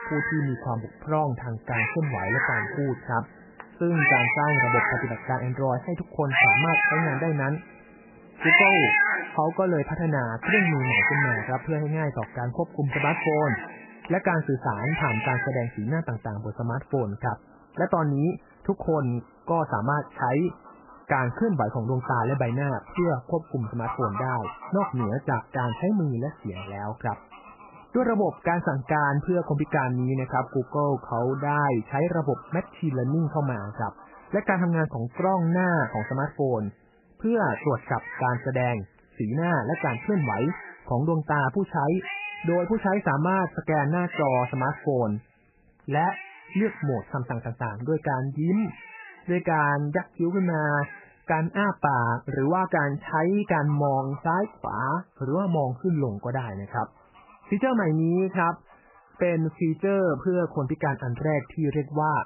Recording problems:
garbled, watery; badly; nothing above 3 kHz
animal sounds; very loud; throughout; 1 dB above the speech

